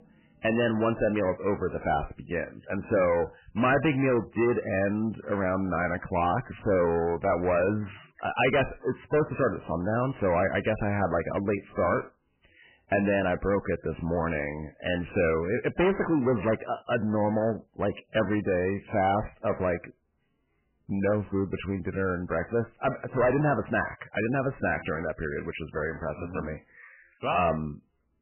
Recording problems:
distortion; heavy; 7 dB below the speech
garbled, watery; badly; nothing above 3 kHz

